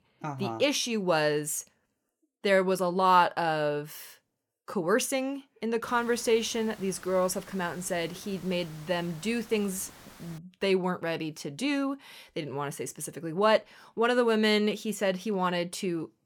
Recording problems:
hiss; faint; from 6 to 10 s; 20 dB below the speech

